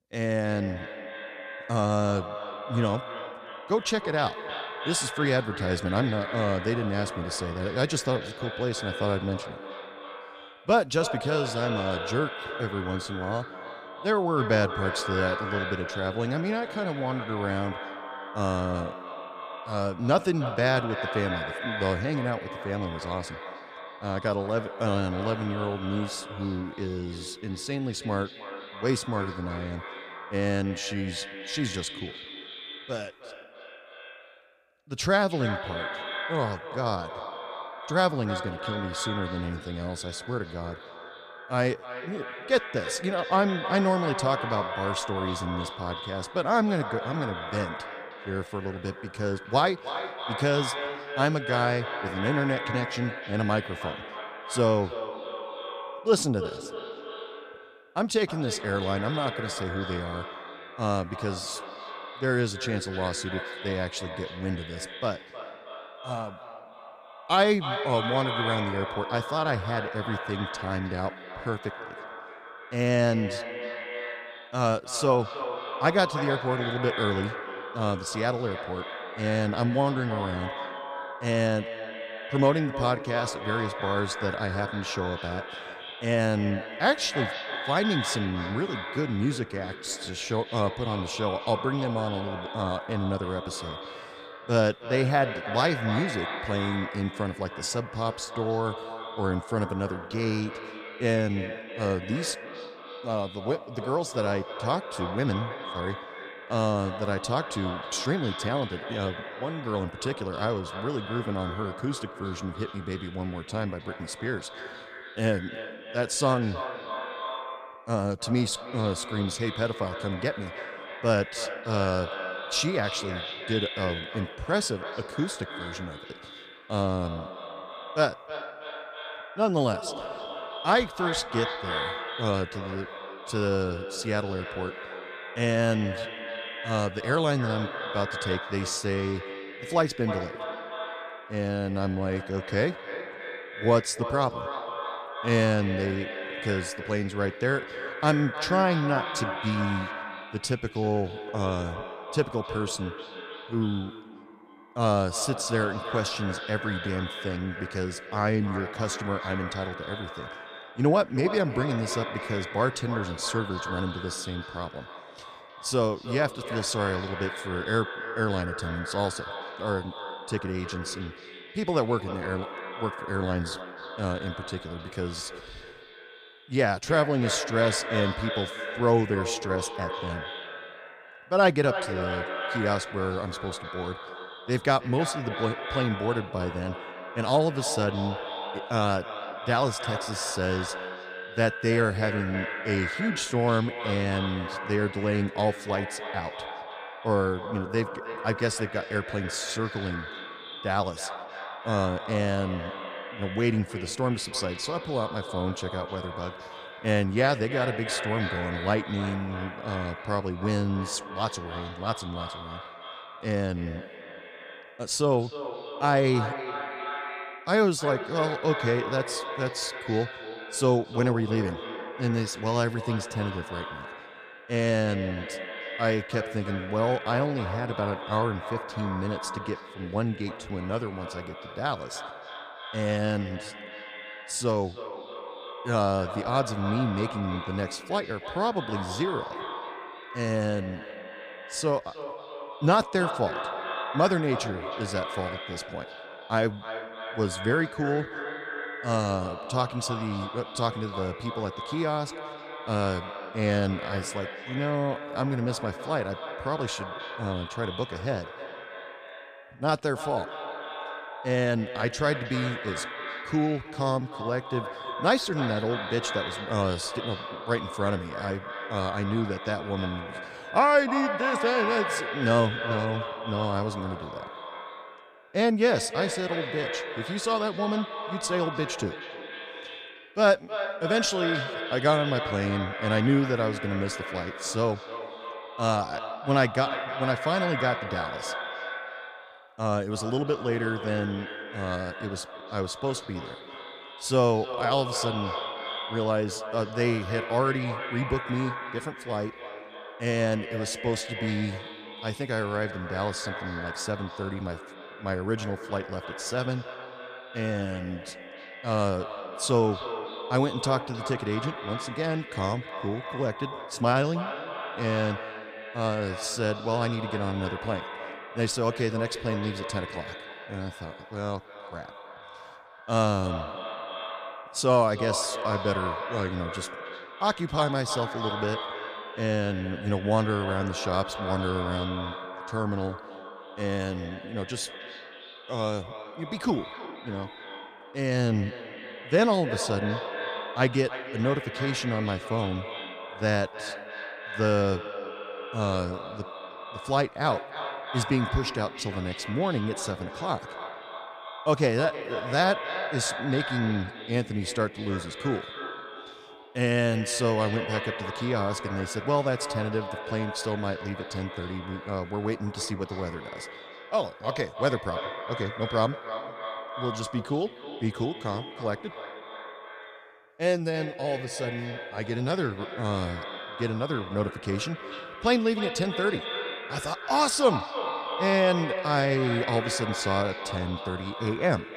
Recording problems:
echo of what is said; strong; throughout; 310 ms later, 7 dB below the speech

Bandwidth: 14.5 kHz